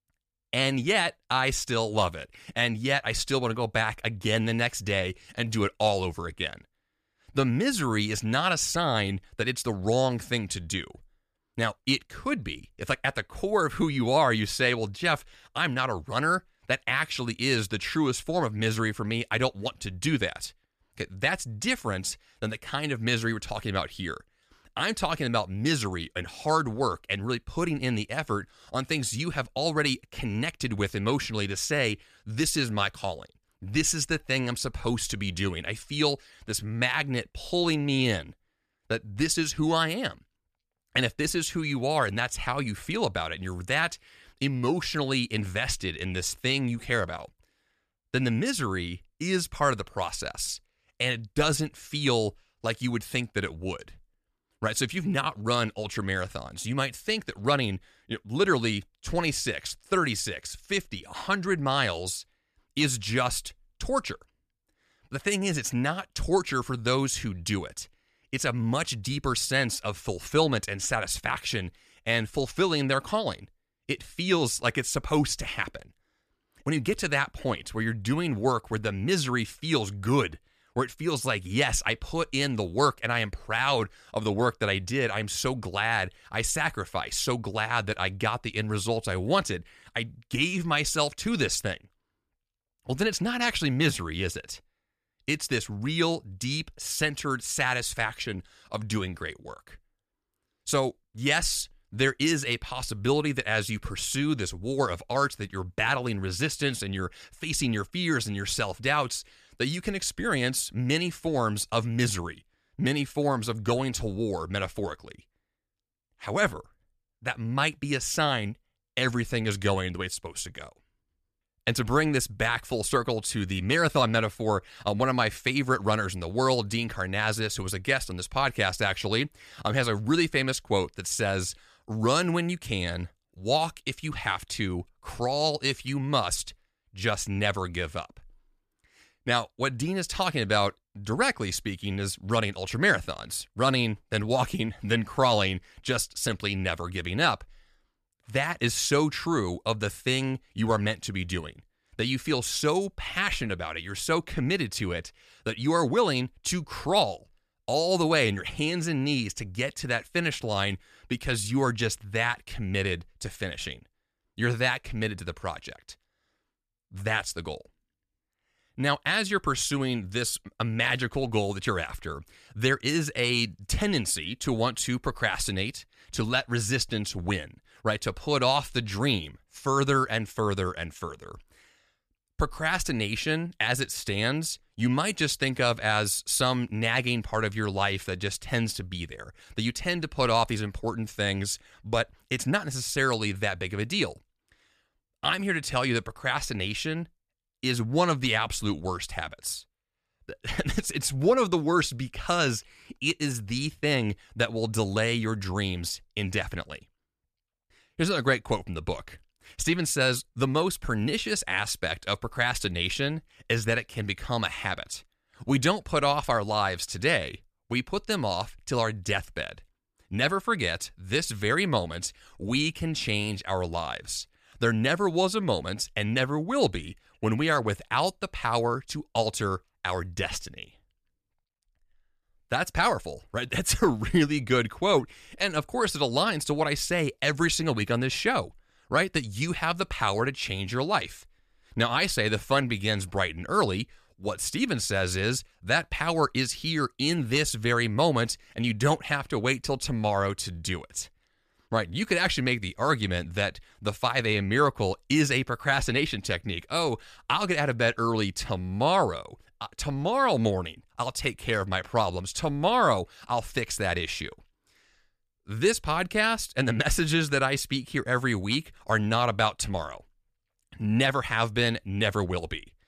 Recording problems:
none

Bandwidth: 14.5 kHz